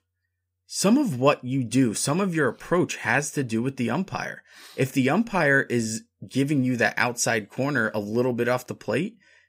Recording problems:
none

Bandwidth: 15.5 kHz